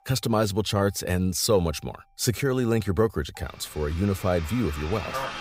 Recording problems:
traffic noise; noticeable; throughout; 10 dB below the speech

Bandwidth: 15.5 kHz